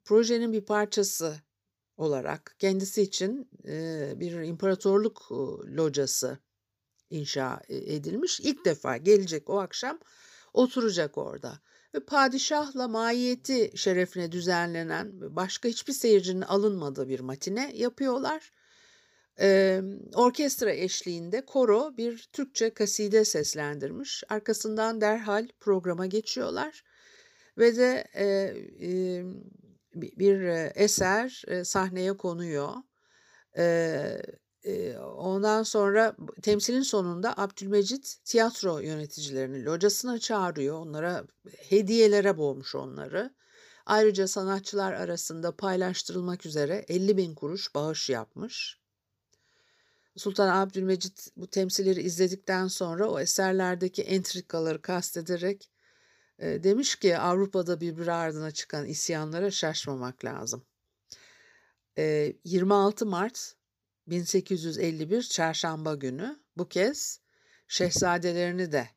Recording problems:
none

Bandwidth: 15 kHz